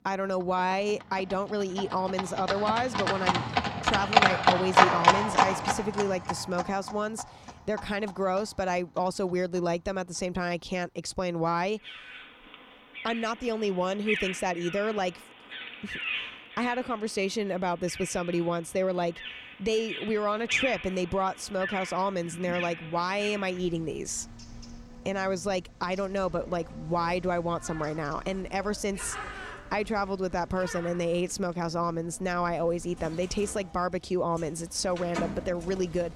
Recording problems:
animal sounds; very loud; throughout; as loud as the speech

